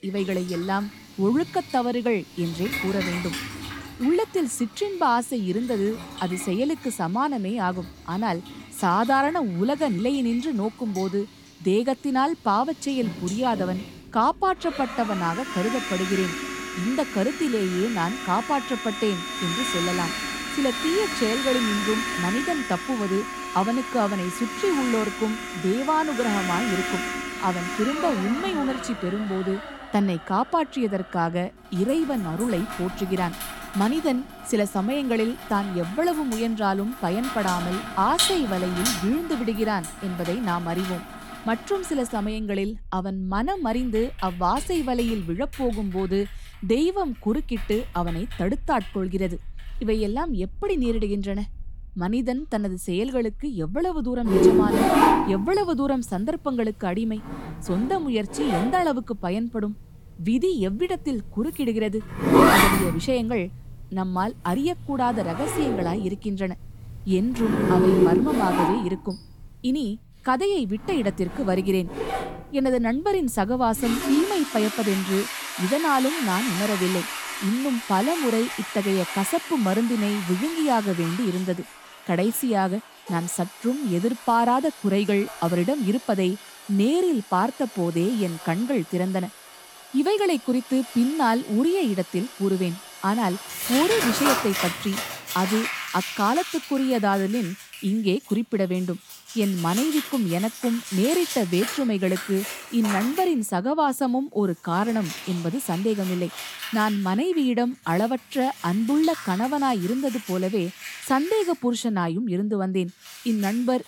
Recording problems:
household noises; loud; throughout; 4 dB below the speech

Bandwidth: 17 kHz